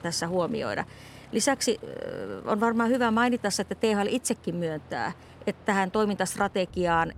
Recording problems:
train or aircraft noise; faint; throughout; 20 dB below the speech

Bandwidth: 16 kHz